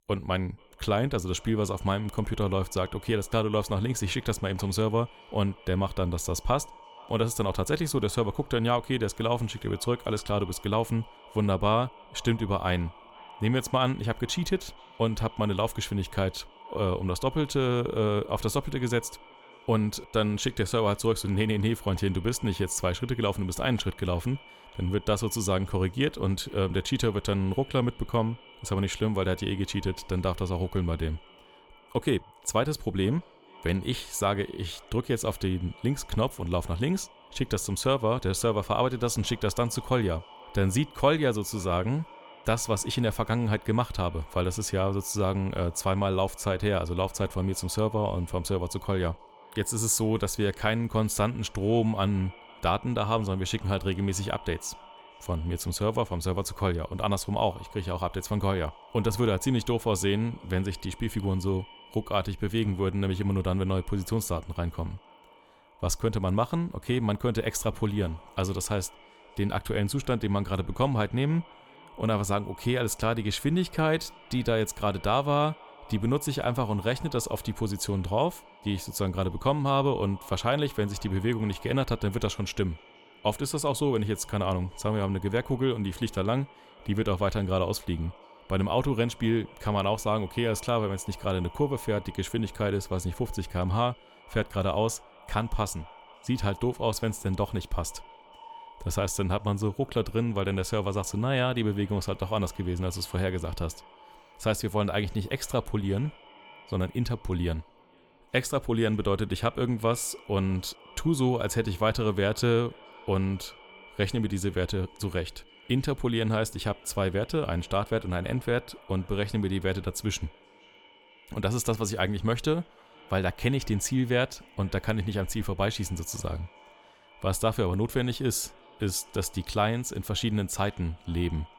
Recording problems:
echo of what is said; faint; throughout; 480 ms later, 20 dB below the speech

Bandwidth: 17.5 kHz